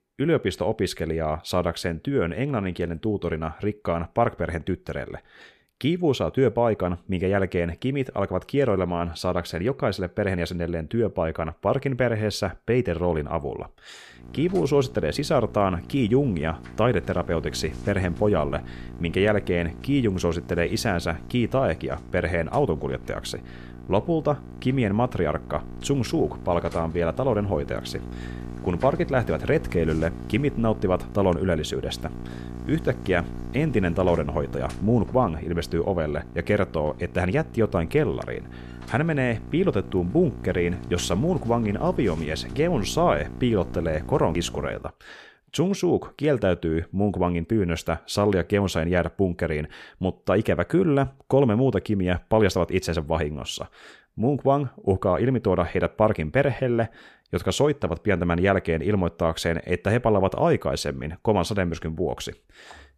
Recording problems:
electrical hum; noticeable; from 14 to 45 s; 60 Hz, 20 dB below the speech

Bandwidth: 14.5 kHz